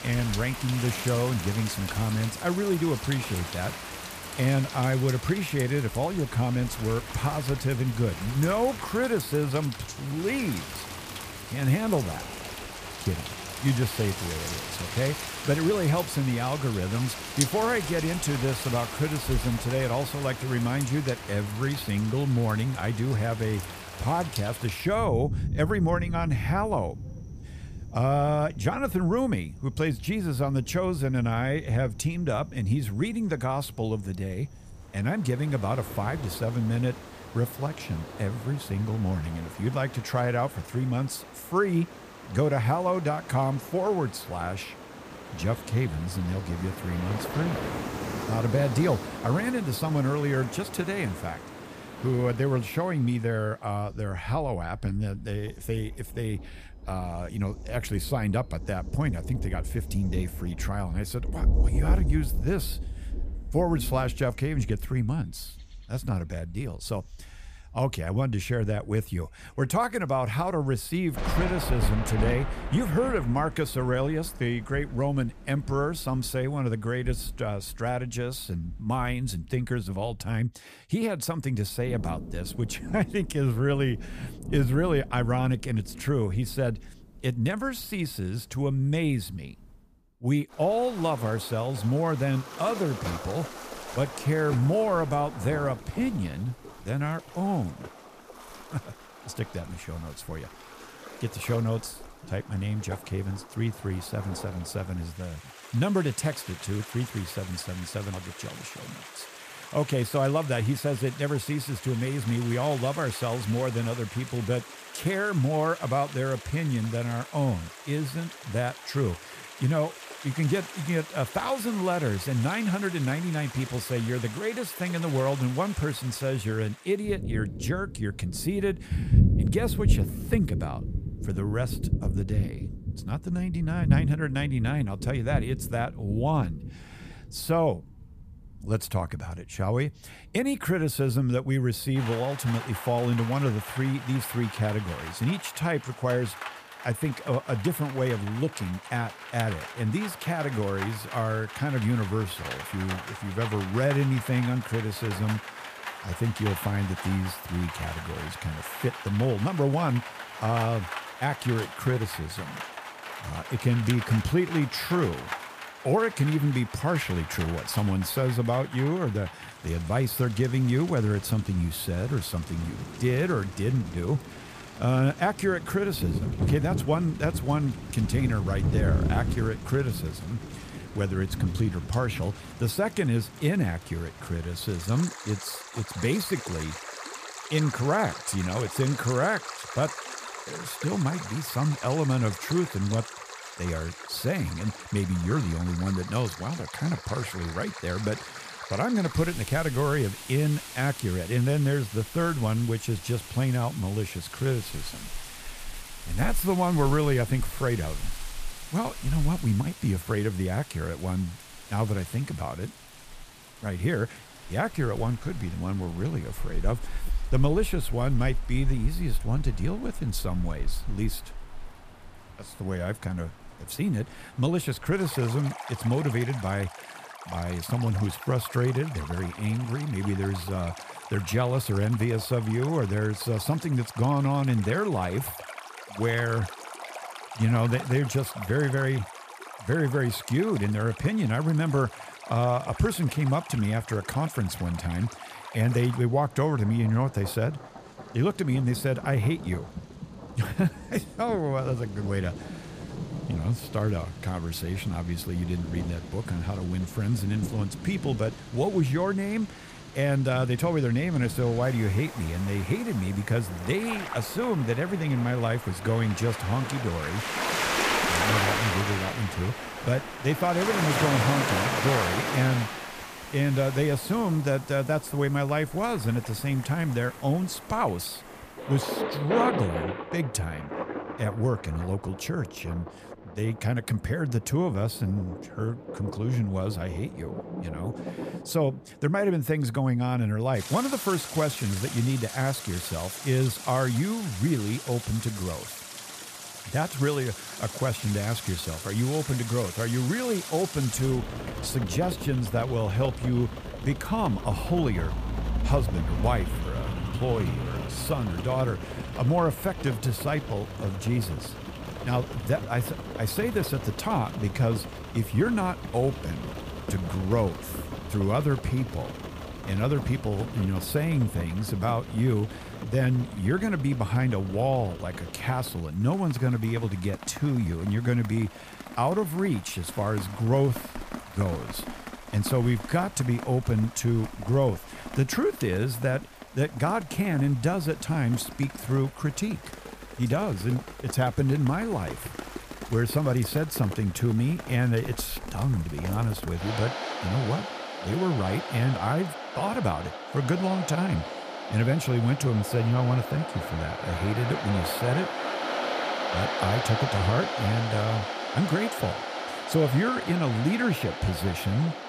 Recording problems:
rain or running water; loud; throughout; 8 dB below the speech

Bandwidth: 15 kHz